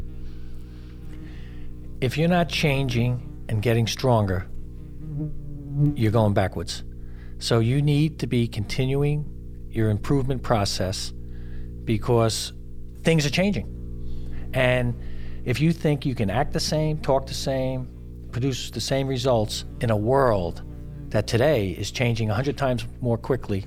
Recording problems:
electrical hum; faint; throughout; 60 Hz, 20 dB below the speech

